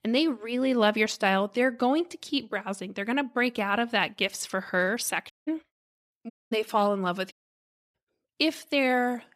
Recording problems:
audio cutting out; at 5.5 s, at 6.5 s and at 7.5 s for 0.5 s

